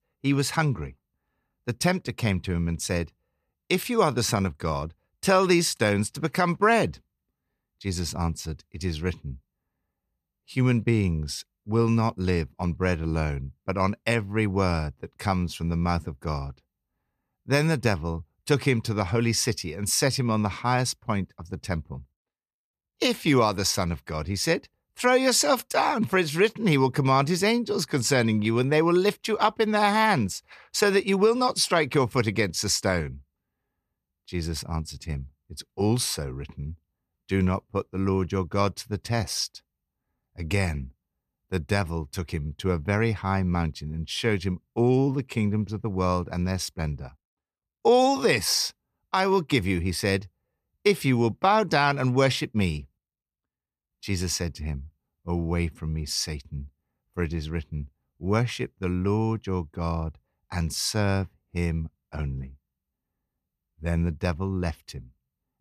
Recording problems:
none

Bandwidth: 14.5 kHz